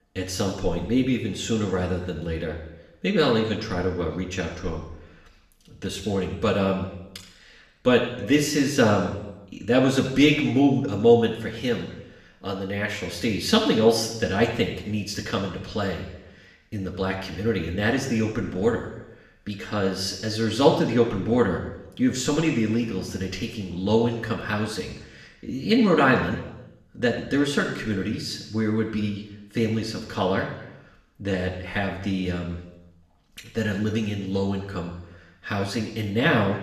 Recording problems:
room echo; noticeable; dies away in 0.9 s
off-mic speech; somewhat distant

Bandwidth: 14 kHz